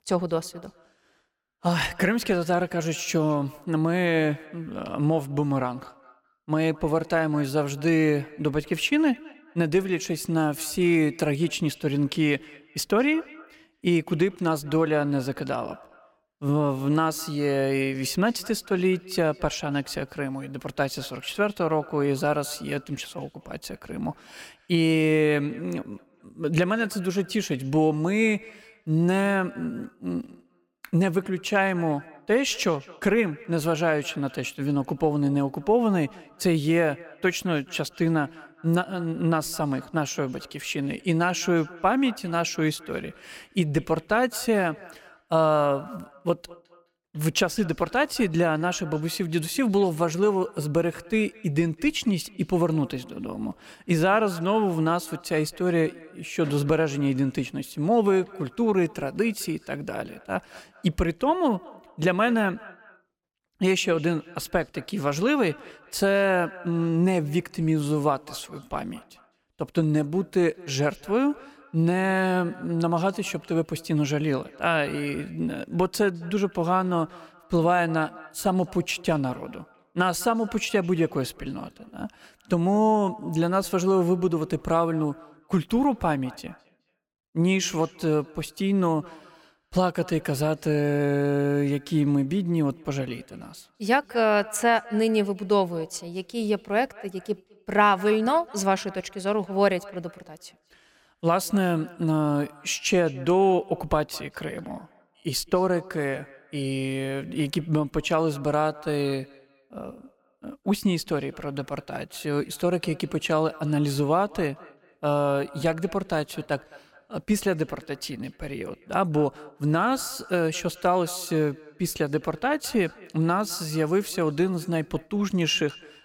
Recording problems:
echo of what is said; faint; throughout; 210 ms later, 20 dB below the speech

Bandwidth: 16.5 kHz